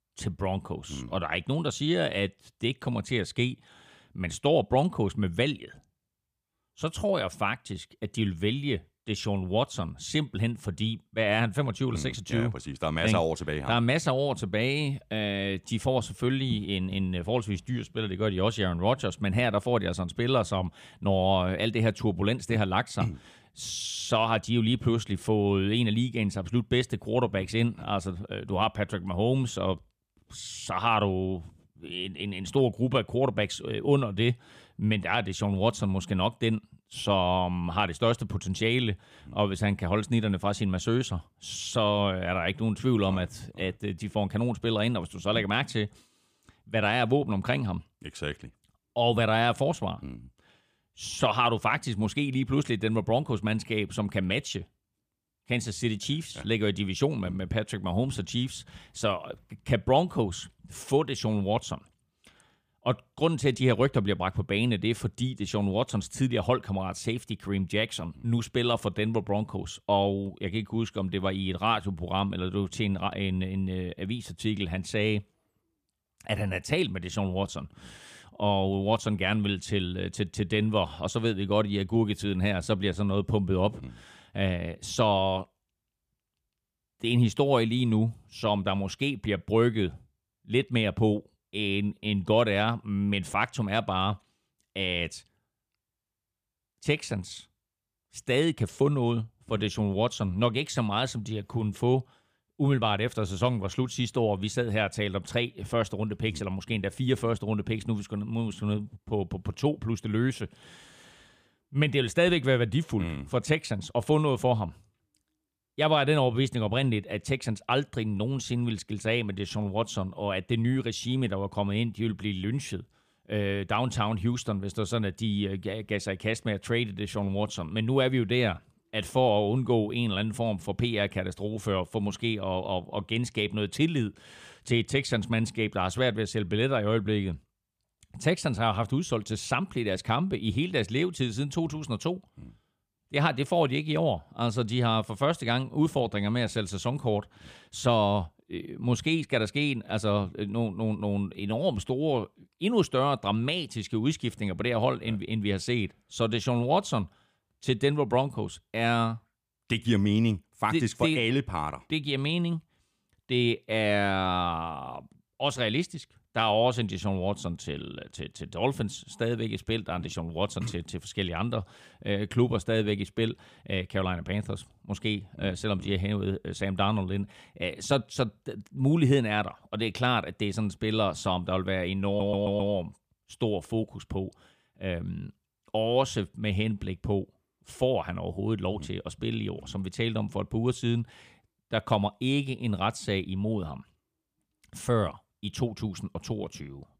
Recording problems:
audio stuttering; at 3:02

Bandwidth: 15 kHz